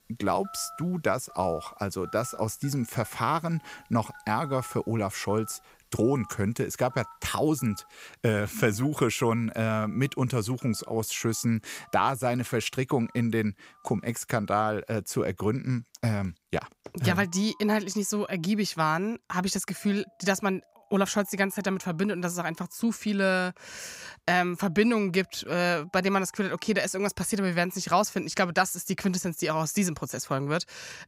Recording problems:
alarms or sirens; faint; throughout; 25 dB below the speech

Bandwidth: 15.5 kHz